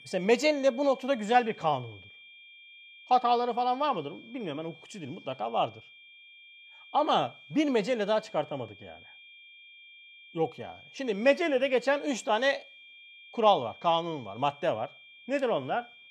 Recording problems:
high-pitched whine; faint; throughout; 2.5 kHz, 20 dB below the speech

